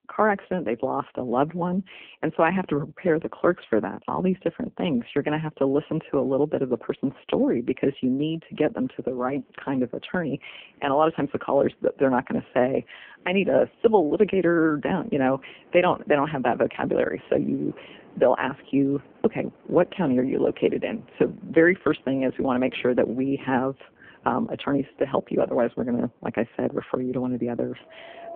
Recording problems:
phone-call audio; poor line
wind in the background; faint; from 9.5 s on; 25 dB below the speech

